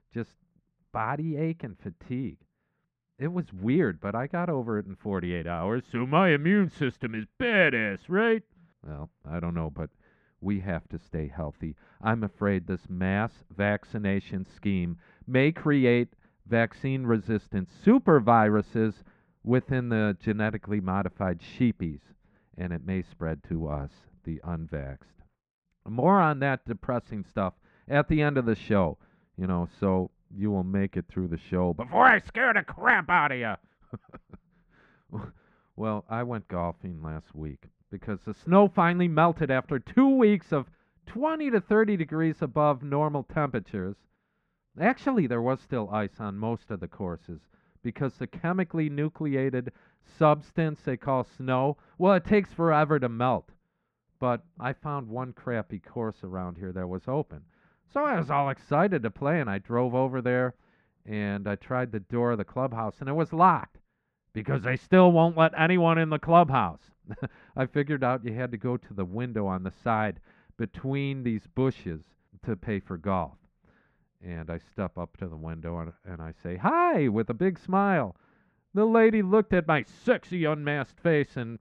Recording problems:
muffled; very; fading above 1.5 kHz

